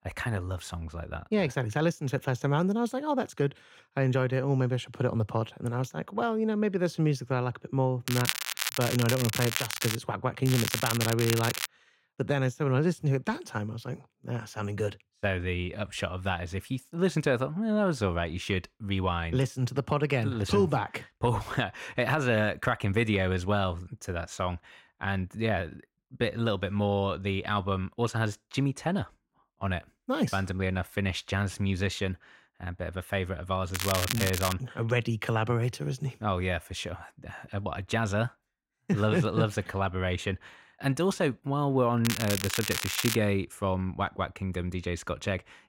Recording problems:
crackling; loud; 4 times, first at 8 s; 2 dB below the speech

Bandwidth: 16 kHz